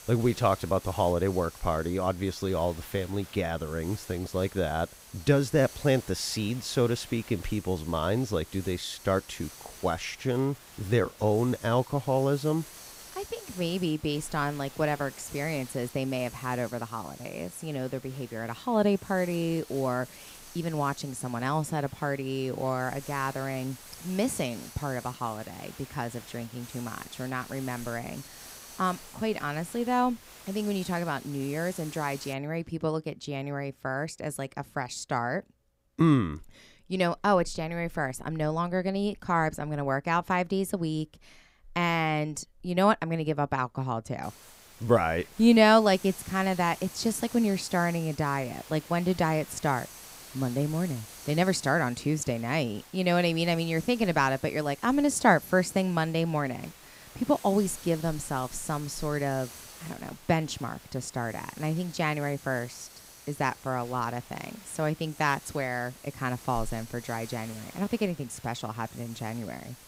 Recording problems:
hiss; noticeable; until 32 s and from 44 s on; 15 dB below the speech

